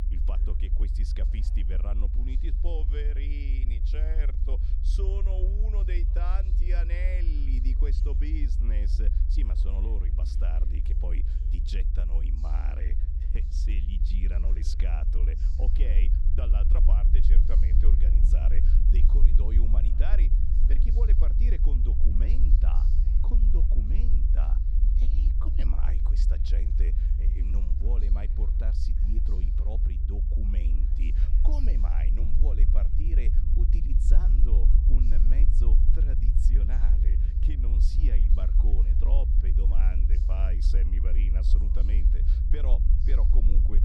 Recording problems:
low rumble; loud; throughout; 2 dB below the speech
voice in the background; faint; throughout; 20 dB below the speech

